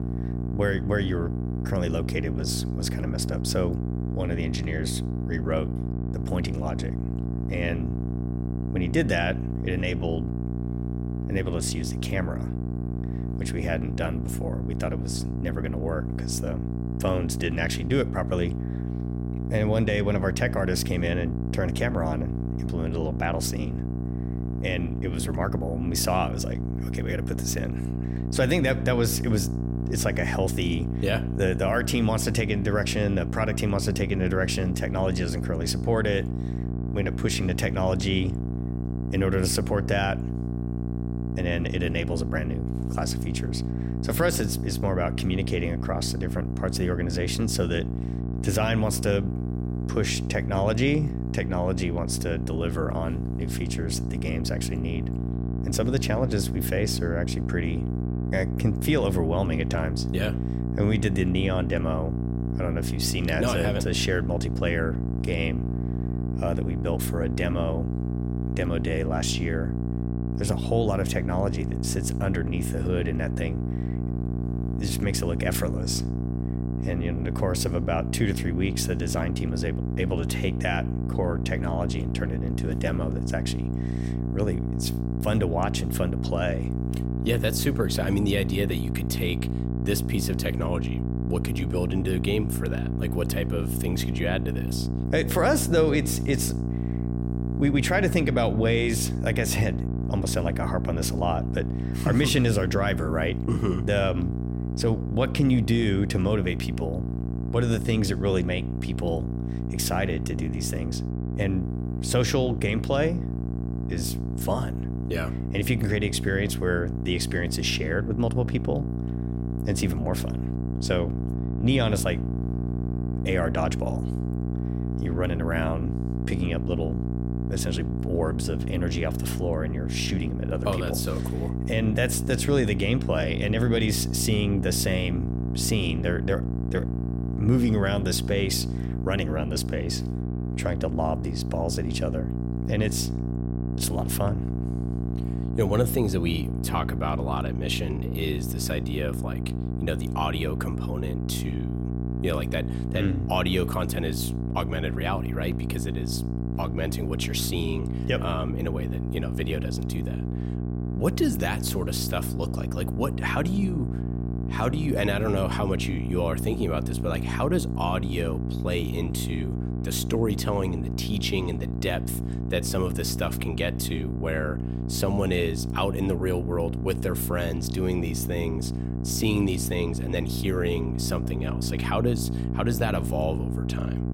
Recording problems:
electrical hum; loud; throughout; 60 Hz, 8 dB below the speech

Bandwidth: 16 kHz